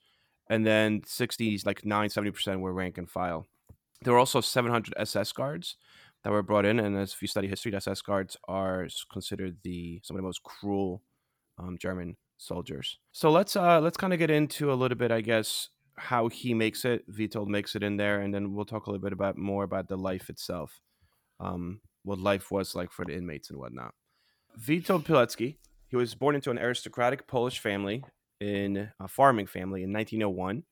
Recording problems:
uneven, jittery; strongly; from 1.5 to 29 s

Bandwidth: 18.5 kHz